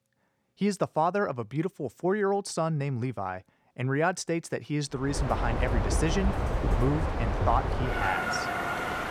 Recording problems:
train or aircraft noise; very loud; from 5 s on; as loud as the speech

